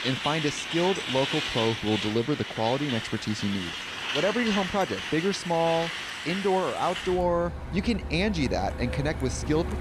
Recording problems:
traffic noise; loud; throughout; 4 dB below the speech

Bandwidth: 15 kHz